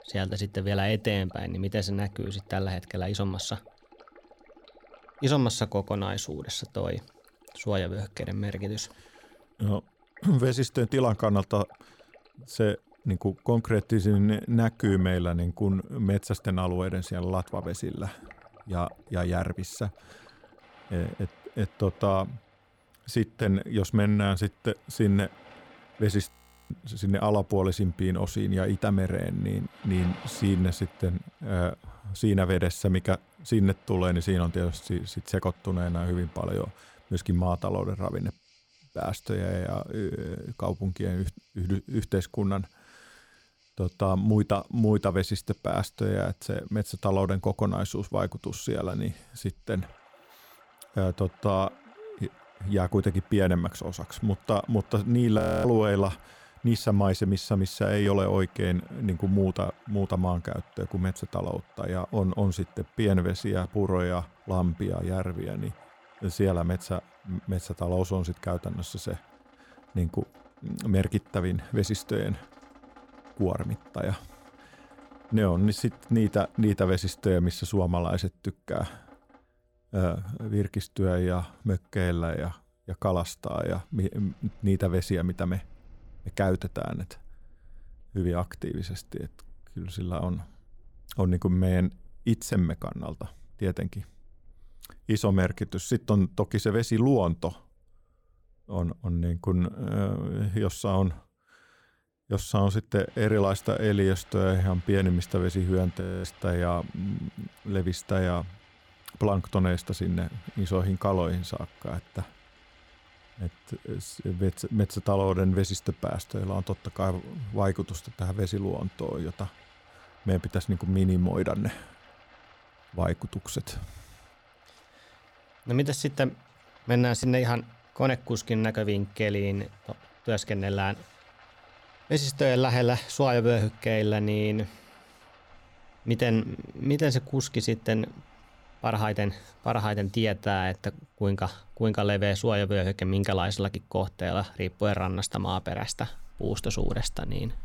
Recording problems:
rain or running water; faint; throughout; 25 dB below the speech
audio freezing; at 26 s, at 55 s and at 1:46

